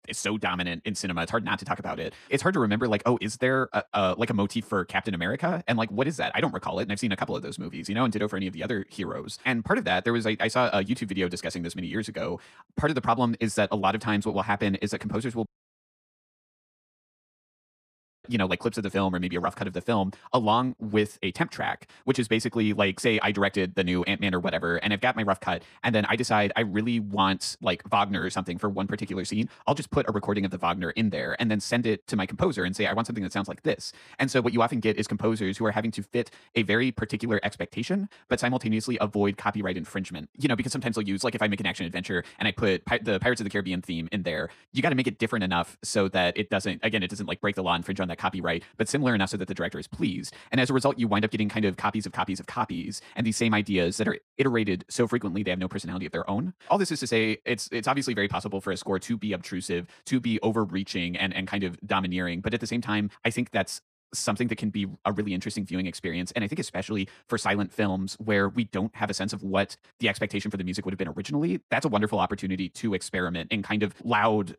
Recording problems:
wrong speed, natural pitch; too fast; 1.7 times normal speed
audio cutting out; at 15 s for 3 s

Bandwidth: 14.5 kHz